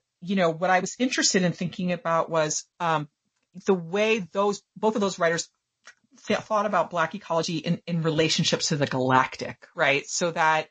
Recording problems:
garbled, watery; slightly; nothing above 7 kHz
uneven, jittery; strongly; from 1 to 9.5 s

